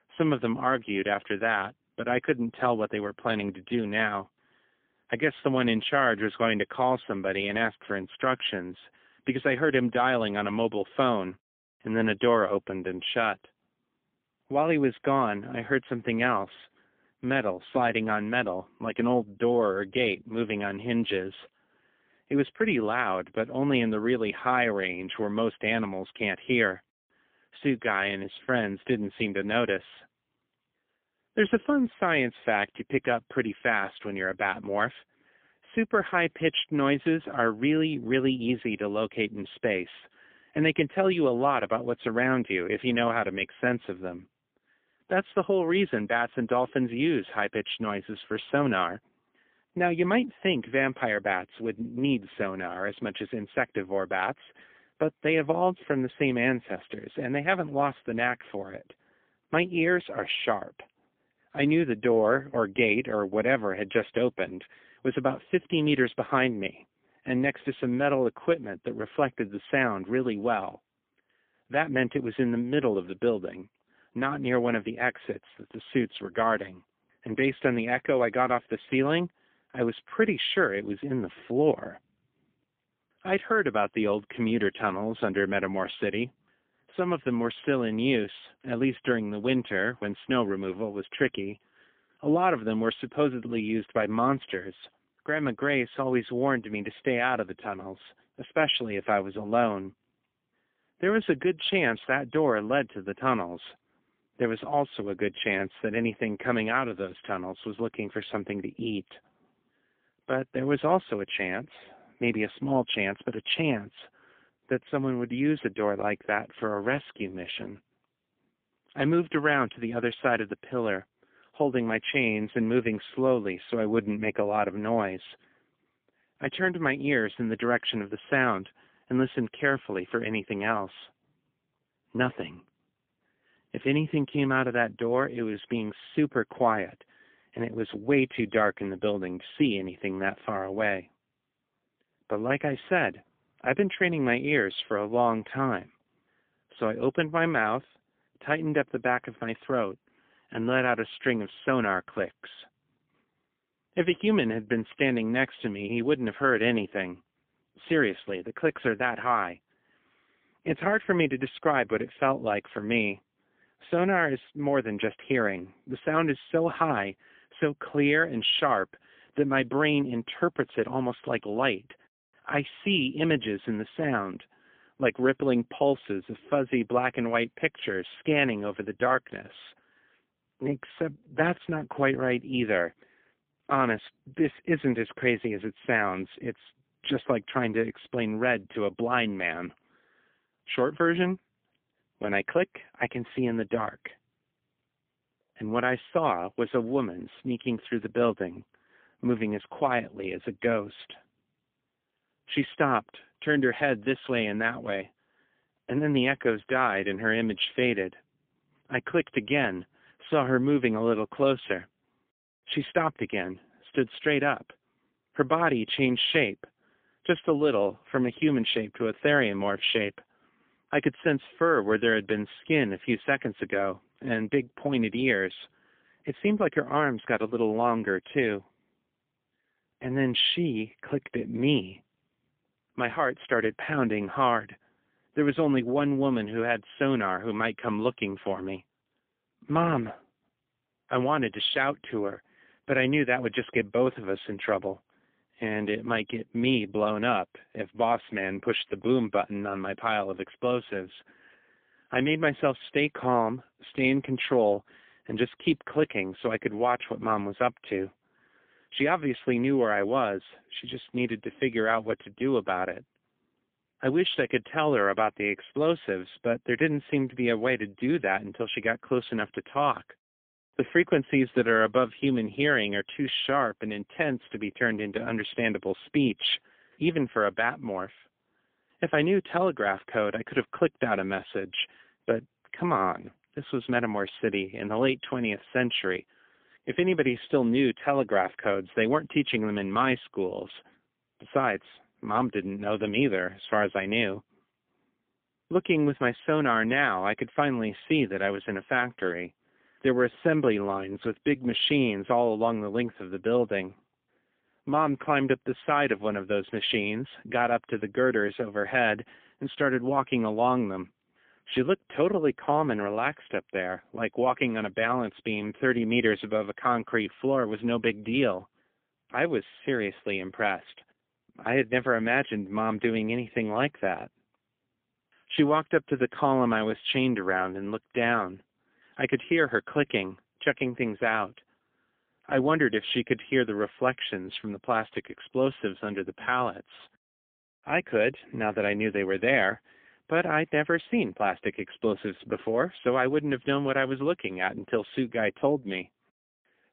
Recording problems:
phone-call audio; poor line; nothing above 3.5 kHz

